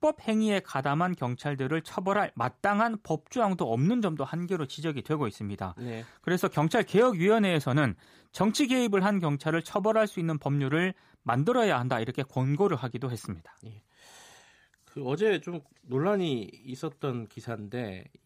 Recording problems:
none

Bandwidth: 15 kHz